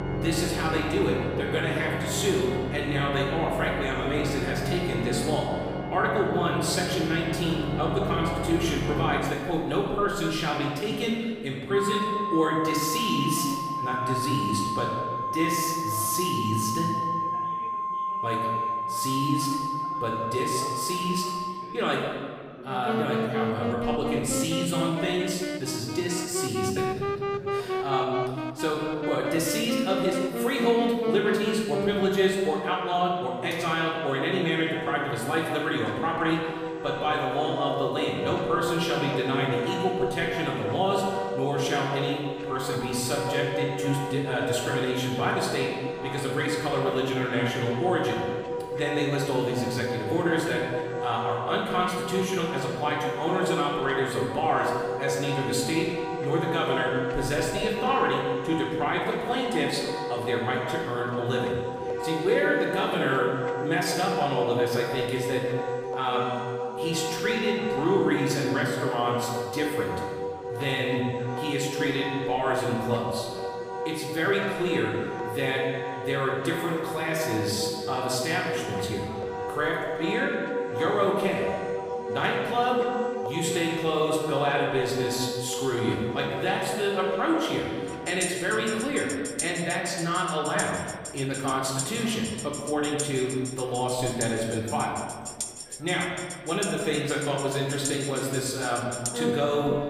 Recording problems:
off-mic speech; far
room echo; noticeable; dies away in 1.4 s
background music; loud; throughout; 4 dB below the speech
chatter from many people; faint; throughout; 20 dB below the speech

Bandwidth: 15 kHz